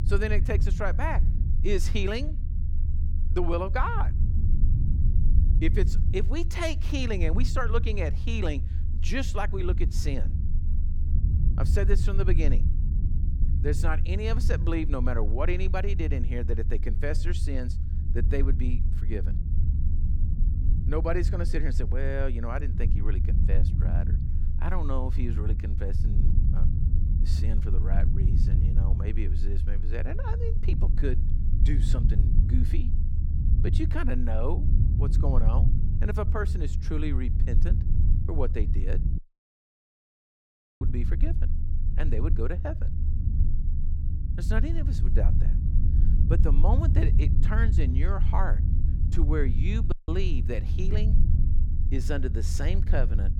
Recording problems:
low rumble; loud; throughout; 9 dB below the speech
audio cutting out; at 39 s for 1.5 s and at 50 s

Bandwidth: 18.5 kHz